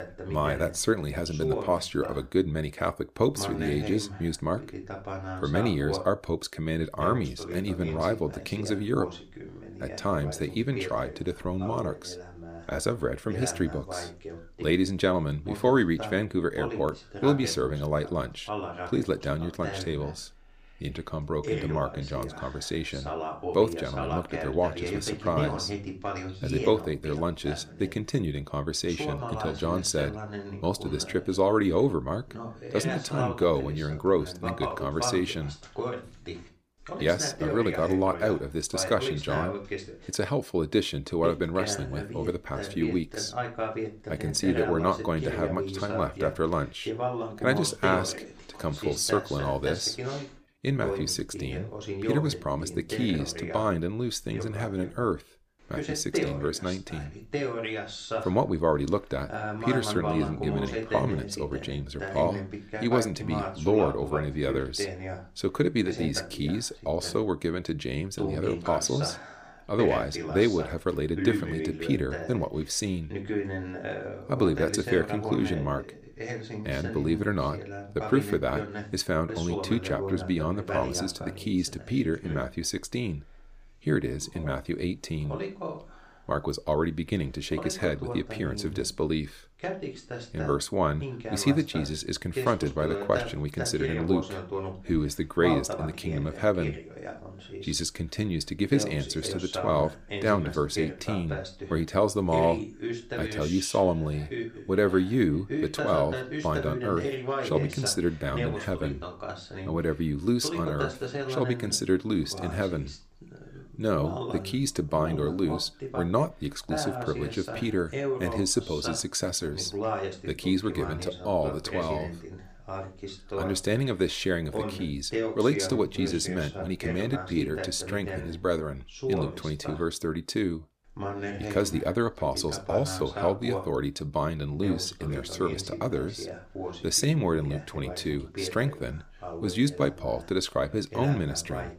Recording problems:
voice in the background; loud; throughout; 7 dB below the speech

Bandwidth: 15 kHz